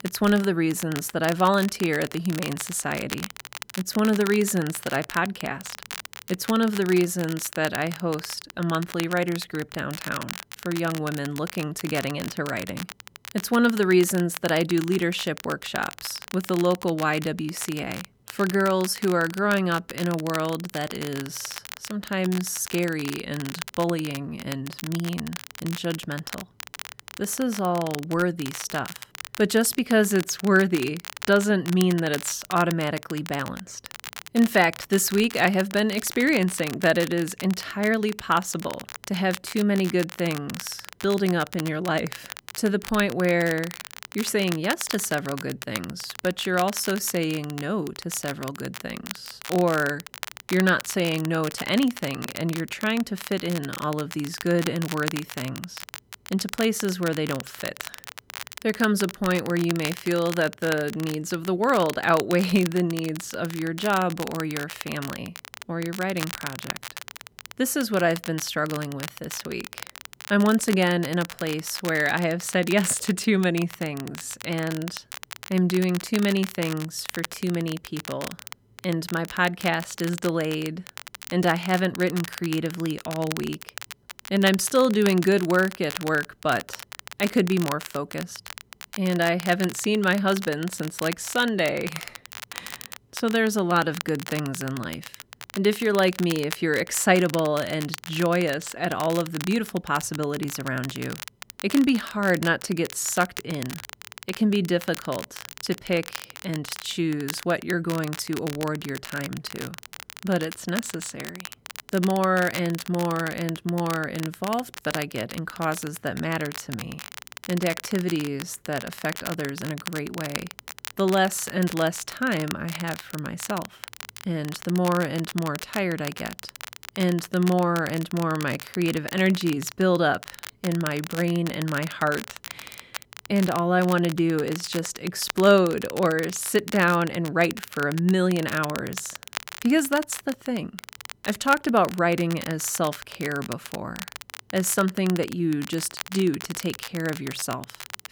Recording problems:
crackle, like an old record; noticeable; 10 dB below the speech

